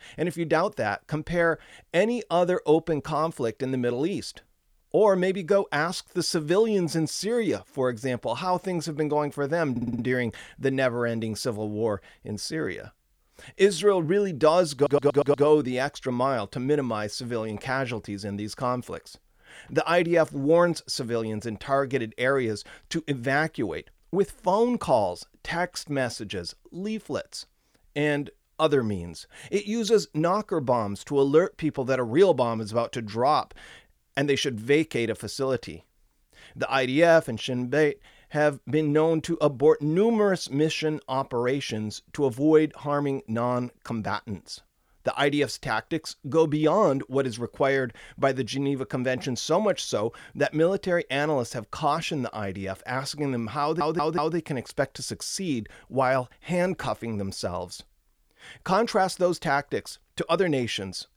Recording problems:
audio stuttering; at 9.5 s, at 15 s and at 54 s

